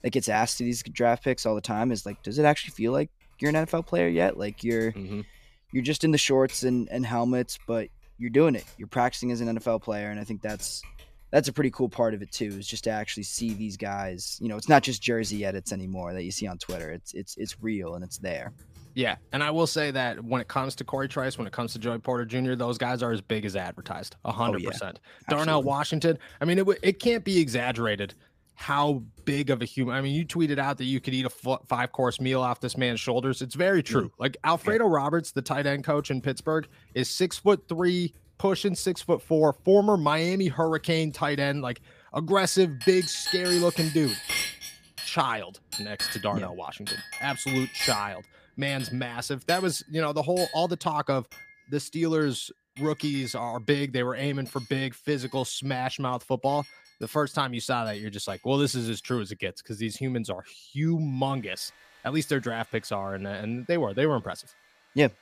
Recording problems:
household noises; loud; throughout; 9 dB below the speech

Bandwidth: 15 kHz